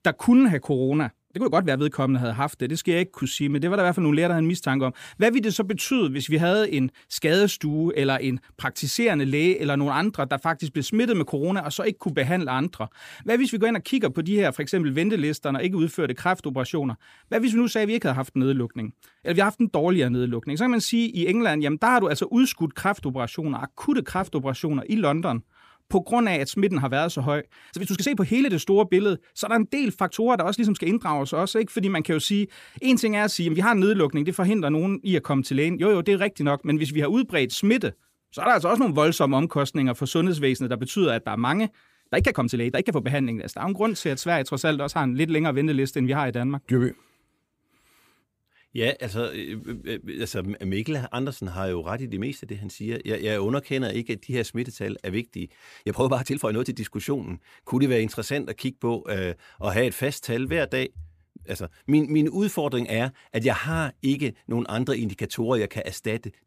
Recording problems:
uneven, jittery; strongly; from 1 s to 1:02

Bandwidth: 15 kHz